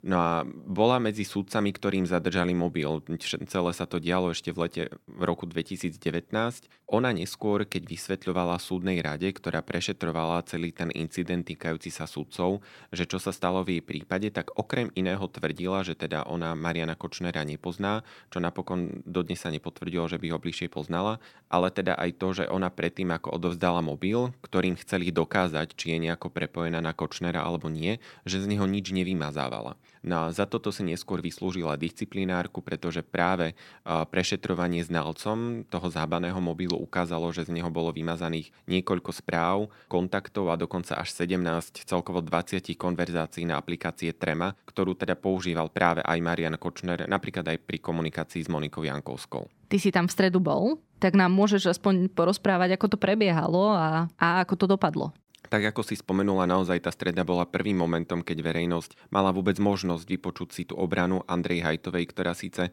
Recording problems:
none

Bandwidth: 18.5 kHz